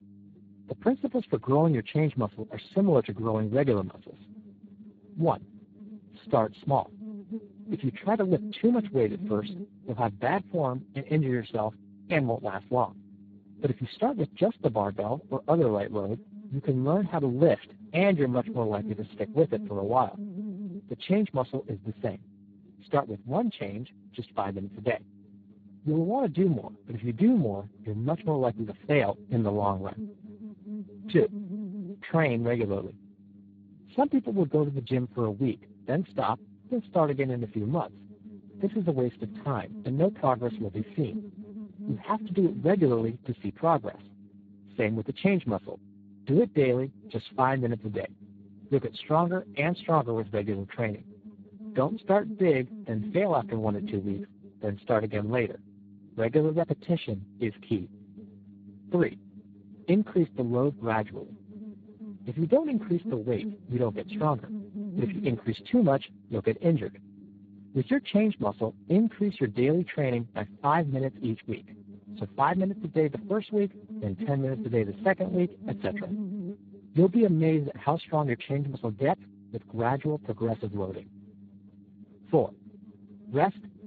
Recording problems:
garbled, watery; badly
electrical hum; faint; throughout; 50 Hz, 20 dB below the speech

